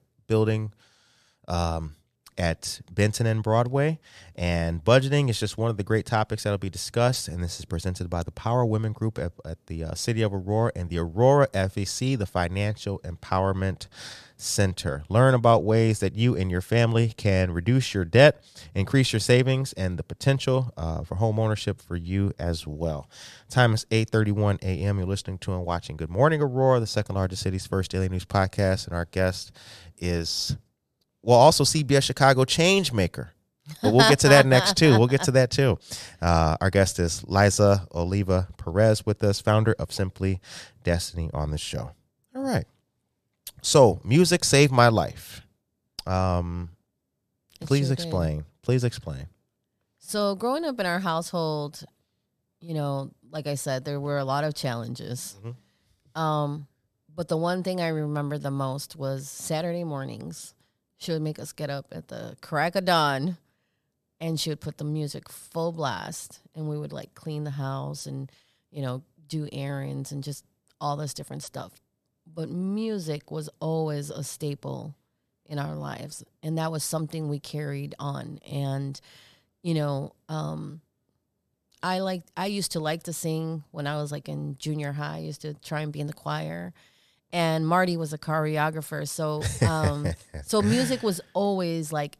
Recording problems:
none

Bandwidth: 14.5 kHz